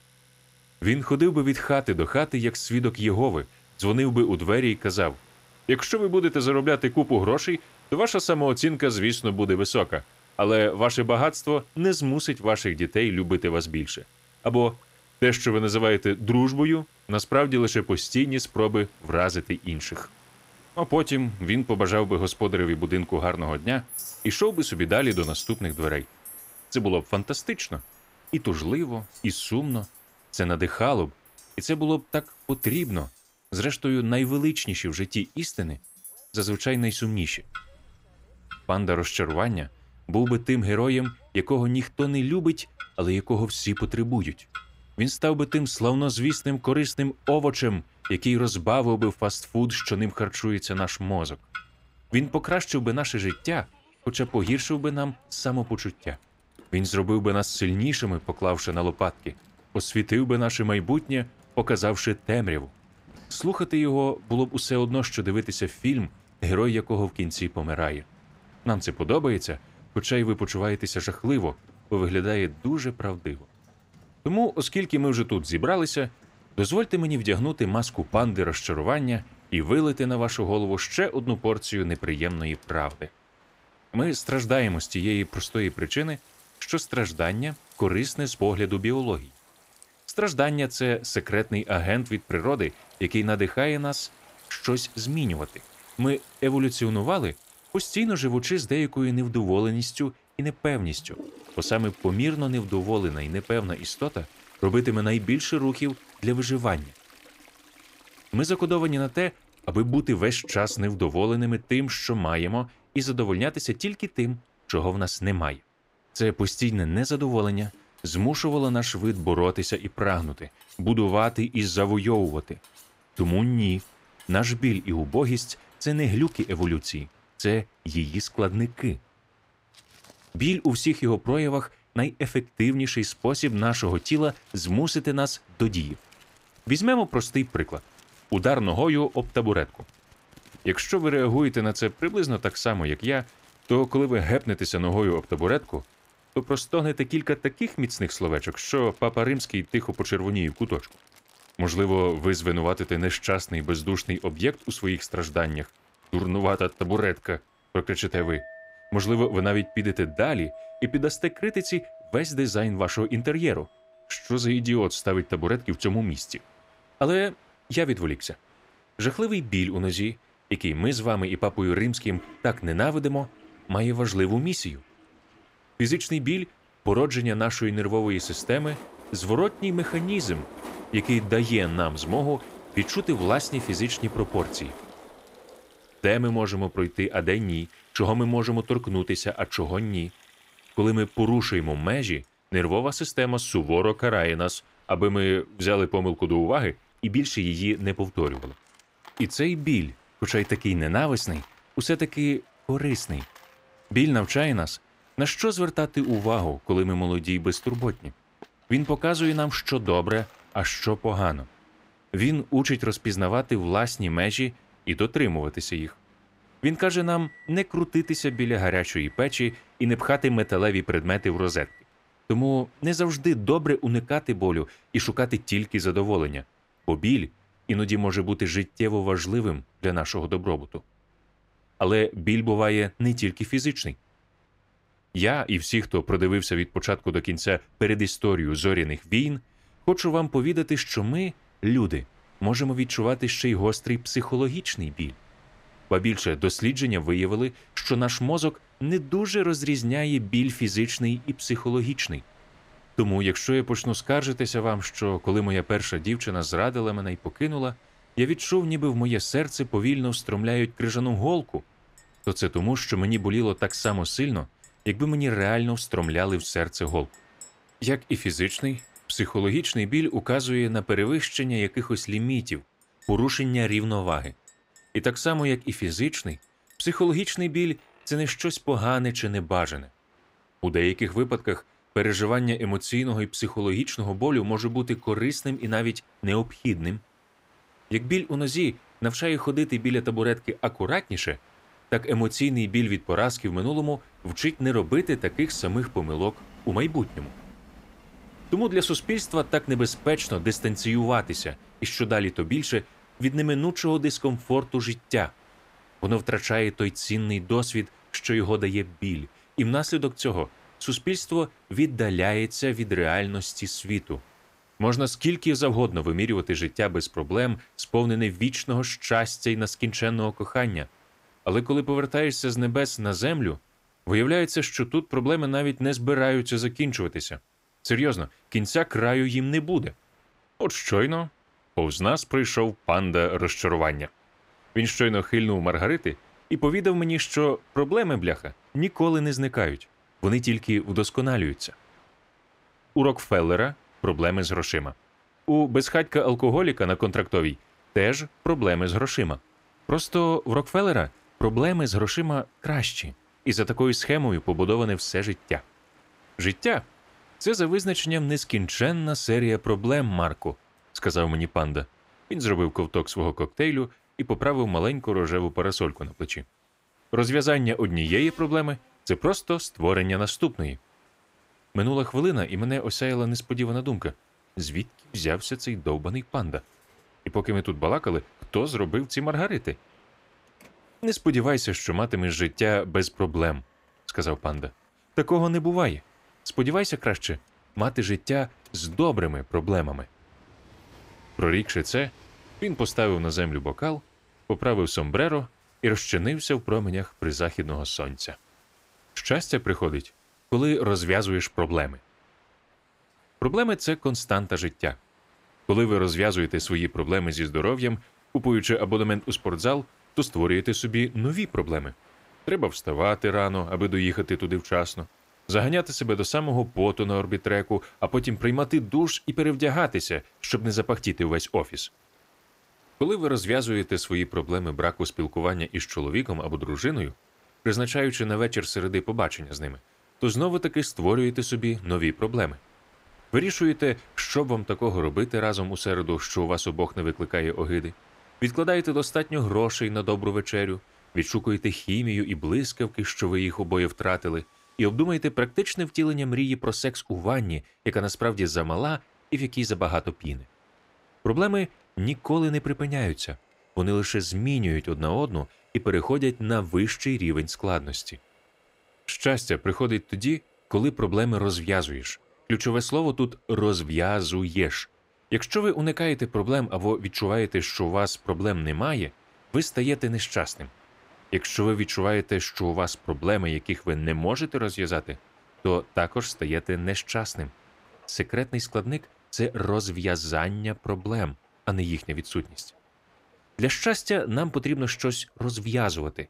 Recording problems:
household noises; faint; throughout; 25 dB below the speech
train or aircraft noise; faint; throughout; 30 dB below the speech

